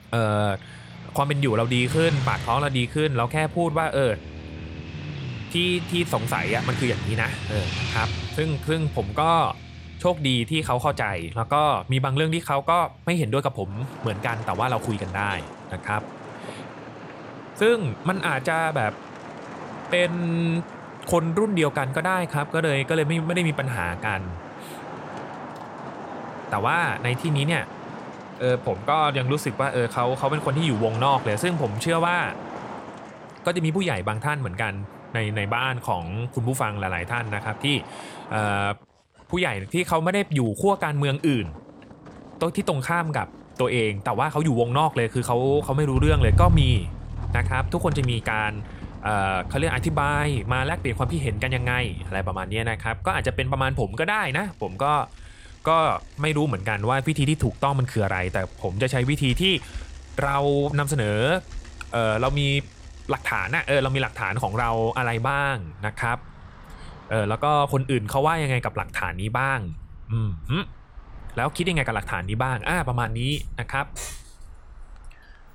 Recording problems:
traffic noise; noticeable; throughout; 10 dB below the speech

